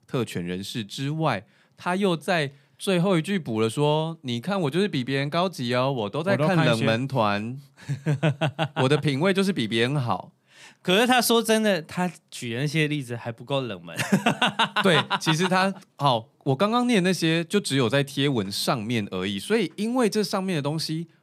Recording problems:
none

